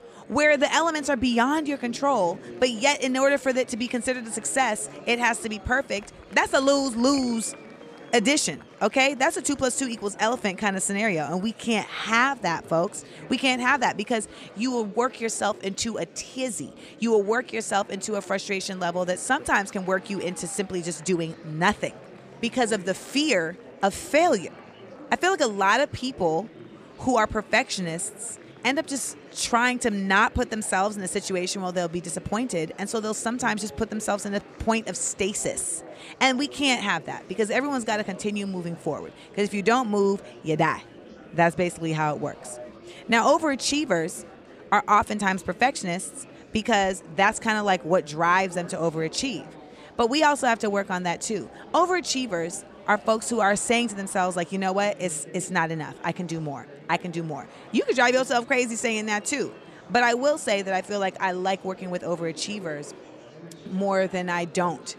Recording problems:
murmuring crowd; faint; throughout; 20 dB below the speech

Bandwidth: 15 kHz